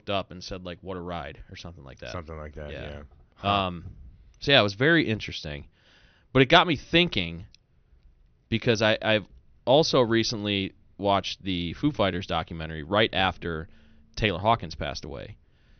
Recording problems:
high frequencies cut off; noticeable; nothing above 6 kHz

